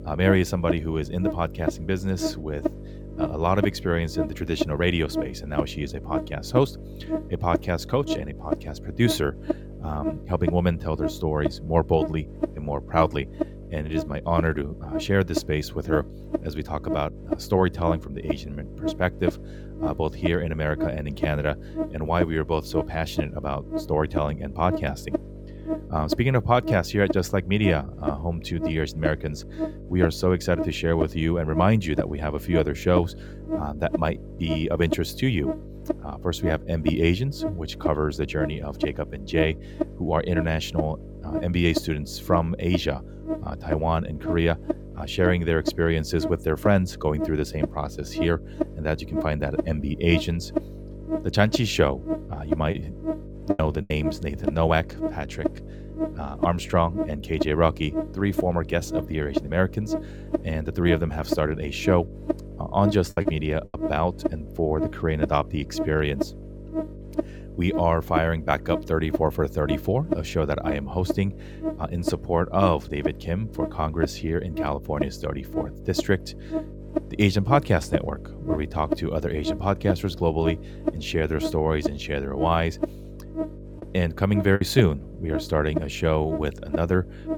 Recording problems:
electrical hum; loud; throughout; 50 Hz, 6 dB below the speech
choppy; very; from 53 to 54 s, at 1:03 and at 1:25; 10% of the speech affected

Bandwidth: 17.5 kHz